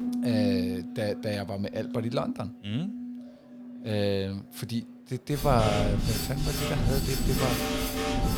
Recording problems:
background music; very loud; throughout; as loud as the speech
murmuring crowd; faint; throughout; 30 dB below the speech

